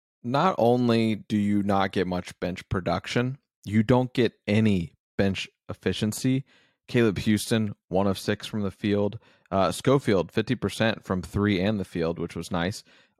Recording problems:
none

